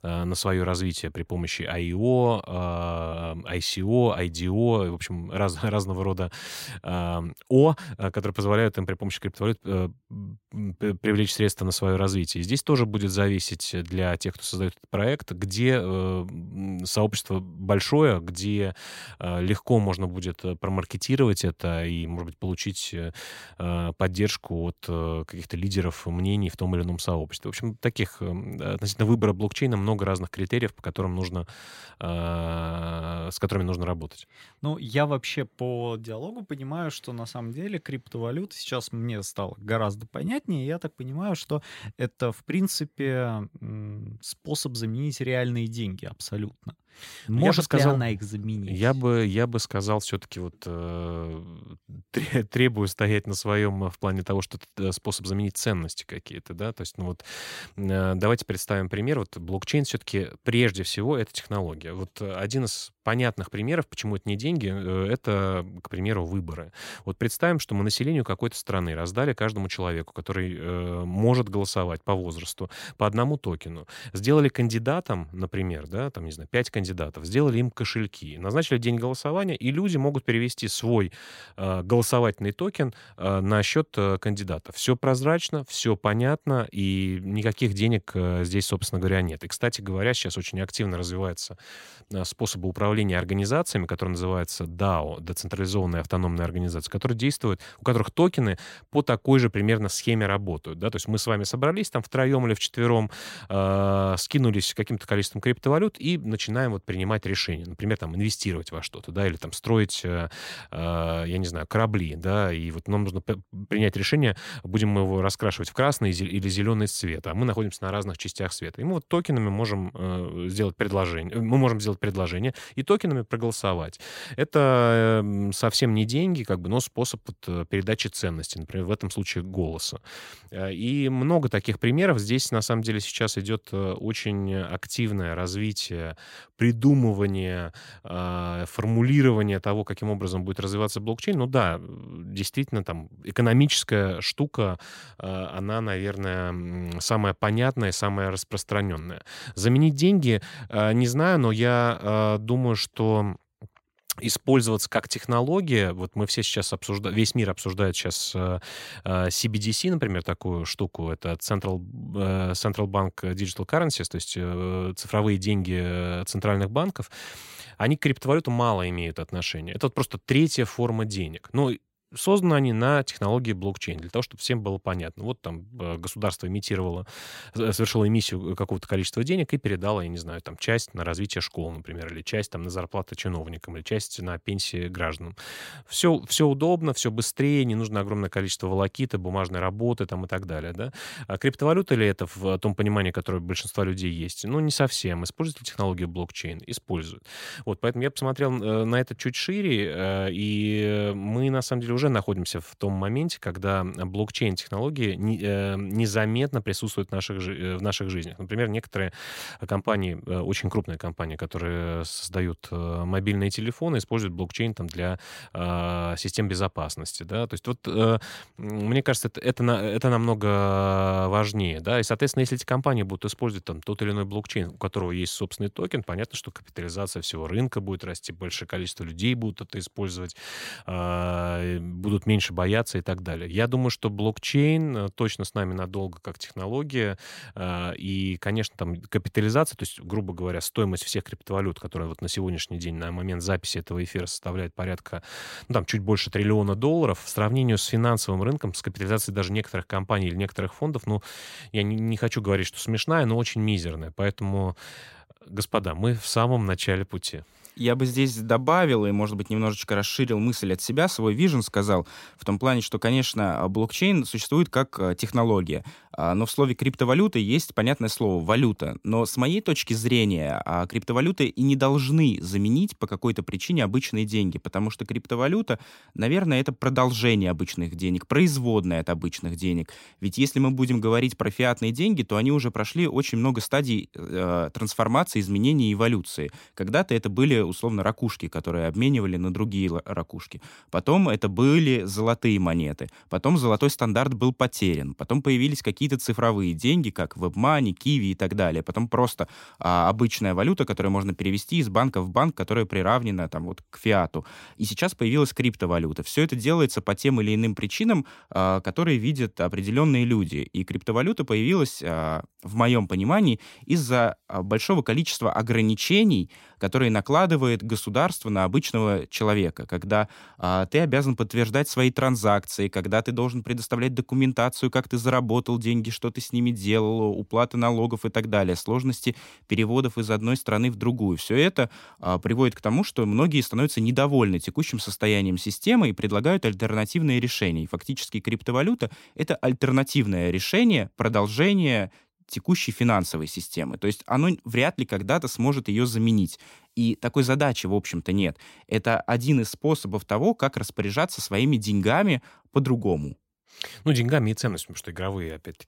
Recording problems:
none

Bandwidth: 16 kHz